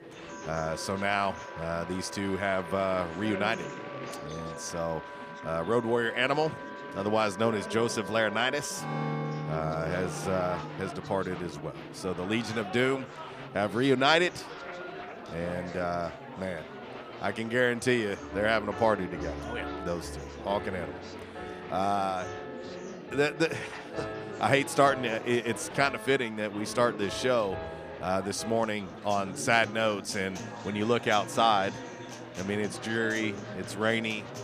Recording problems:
background music; noticeable; throughout; 15 dB below the speech
chatter from many people; noticeable; throughout; 15 dB below the speech

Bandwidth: 15 kHz